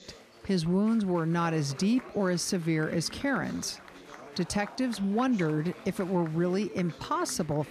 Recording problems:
chatter from many people; noticeable; throughout; 20 dB below the speech

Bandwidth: 14.5 kHz